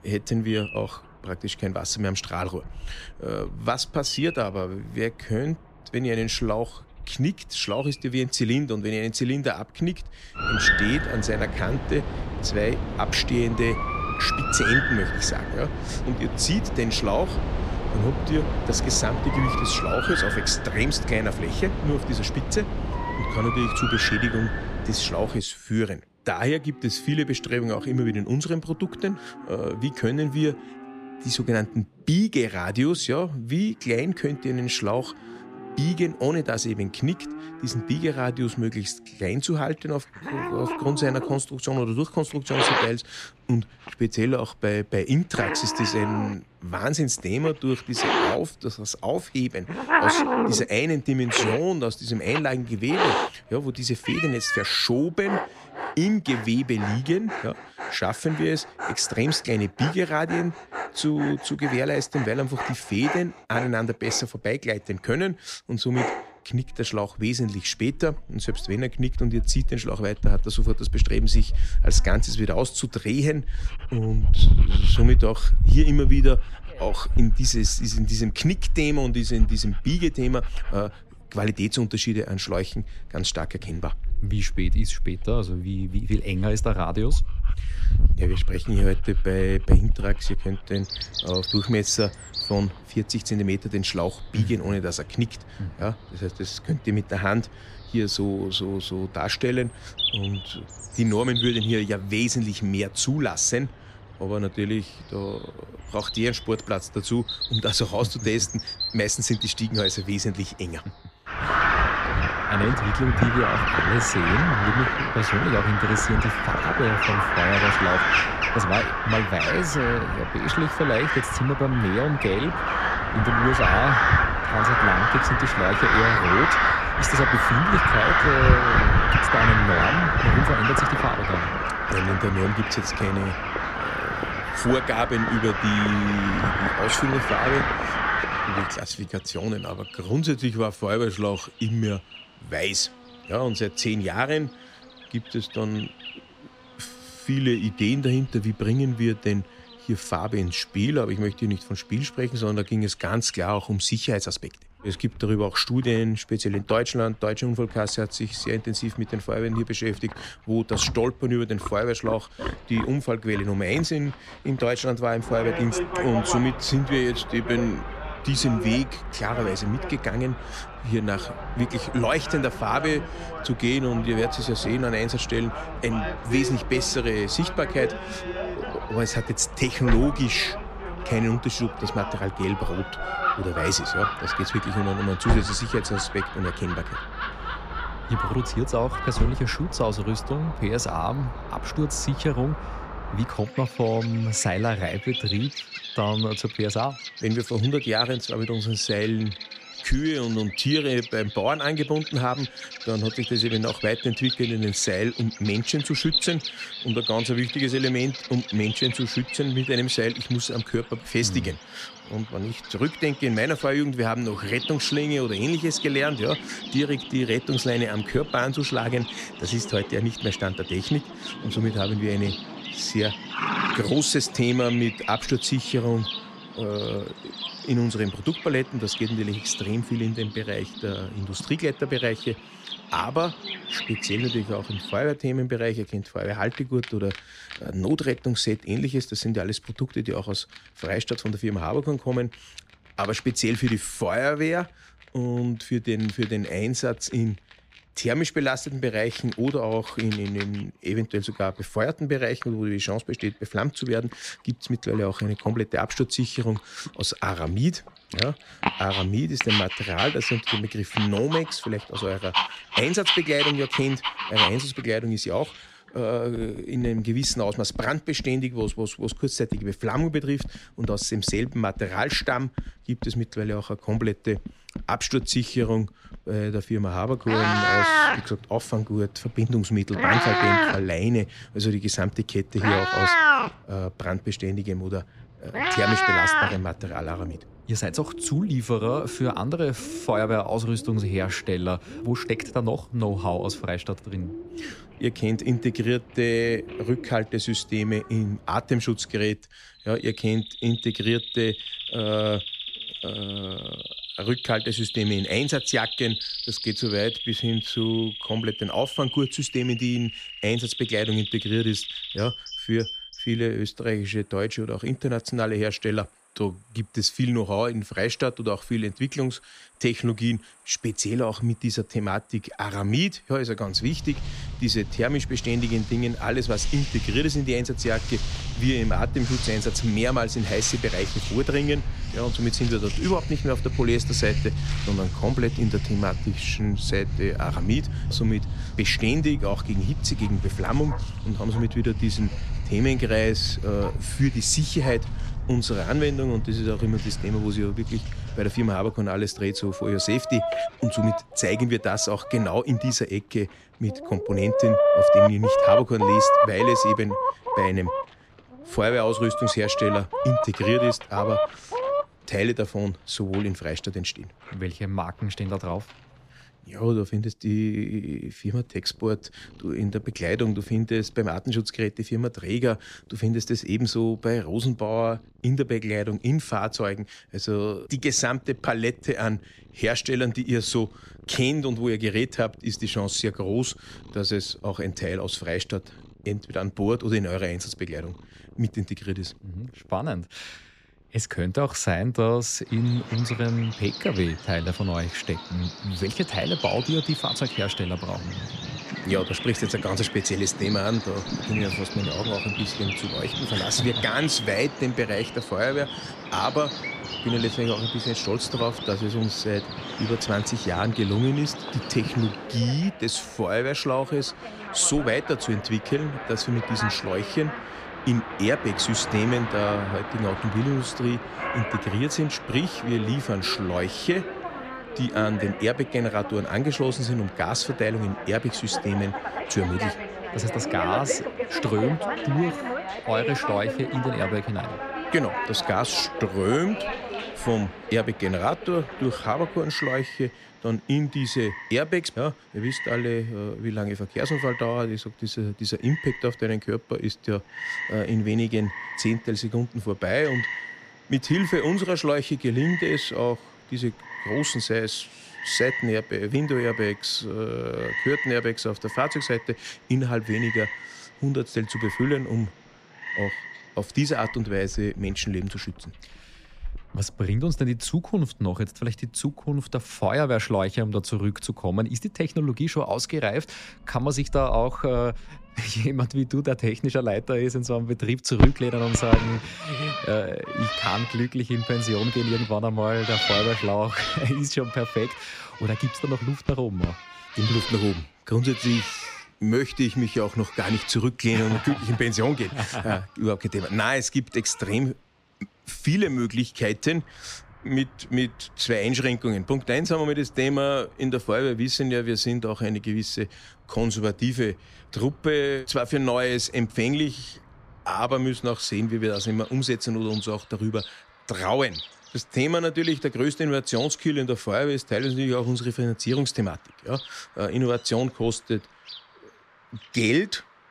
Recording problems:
animal sounds; loud; throughout; 2 dB below the speech

